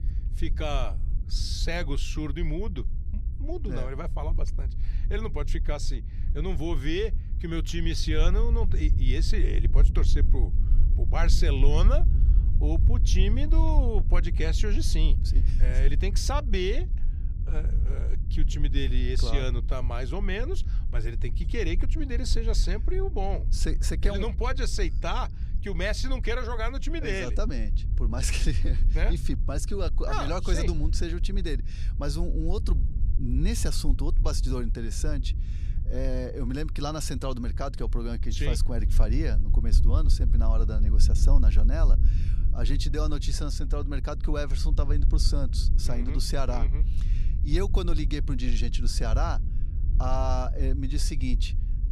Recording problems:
low rumble; noticeable; throughout; 15 dB below the speech

